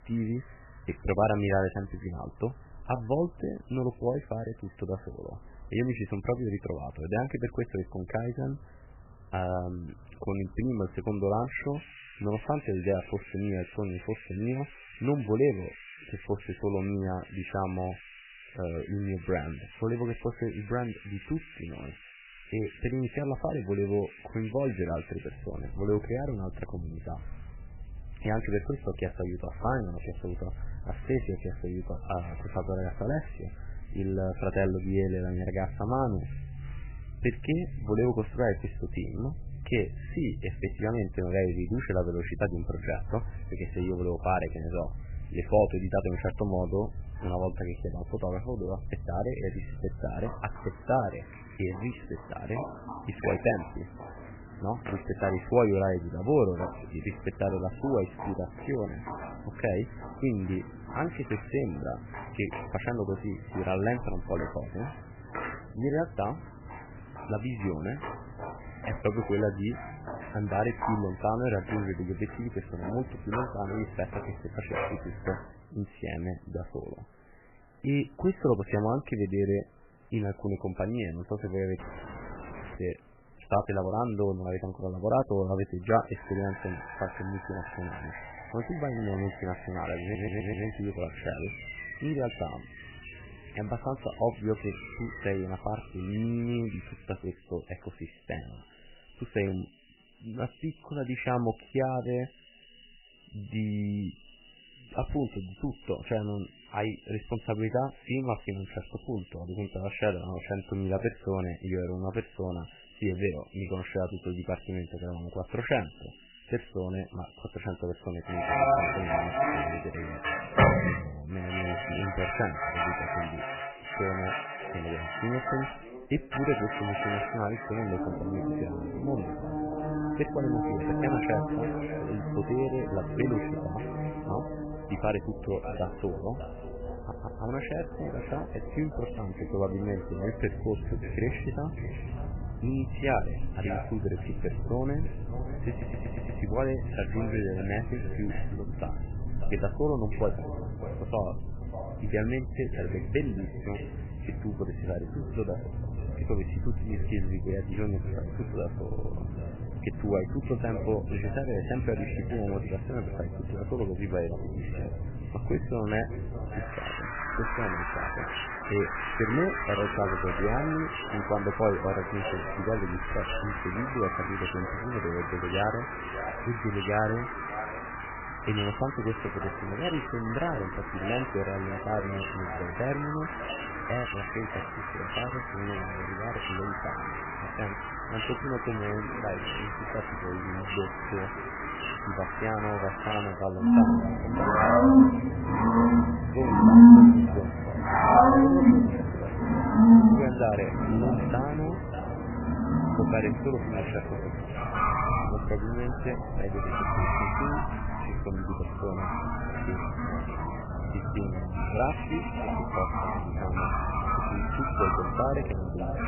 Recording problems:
garbled, watery; badly; nothing above 3 kHz
echo of what is said; noticeable; from 2:03 on; 590 ms later, 10 dB below the speech
animal sounds; very loud; throughout; 4 dB above the speech
audio cutting out; at 1:22 for 1 s
audio stuttering; 4 times, first at 1:30

